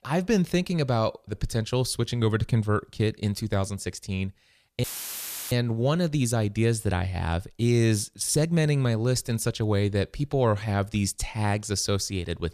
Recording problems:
audio cutting out; filled with static; at 5 s for 0.5 s

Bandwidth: 14.5 kHz